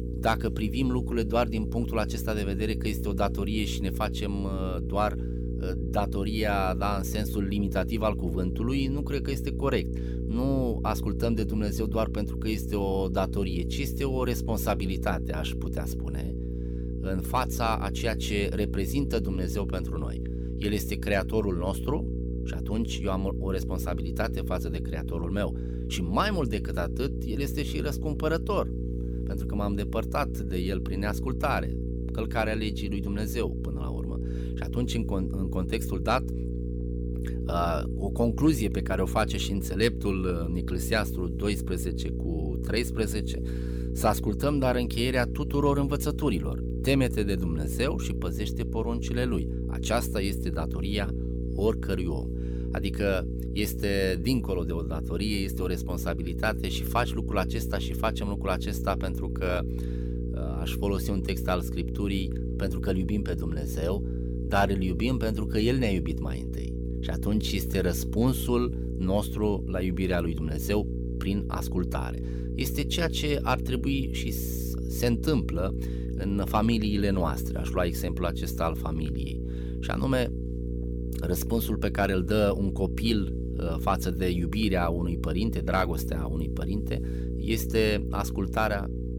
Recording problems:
electrical hum; loud; throughout; 60 Hz, 10 dB below the speech

